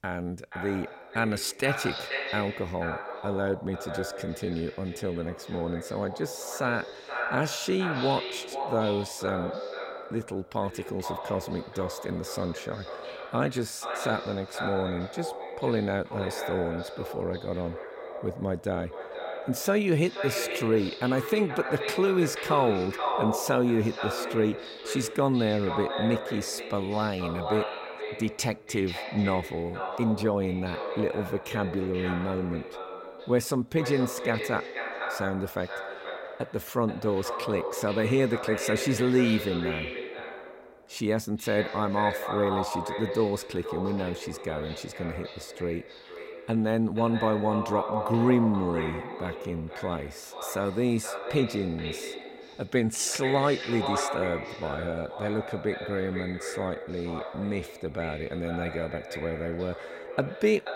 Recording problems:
echo of what is said; strong; throughout; 480 ms later, 6 dB below the speech

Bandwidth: 16 kHz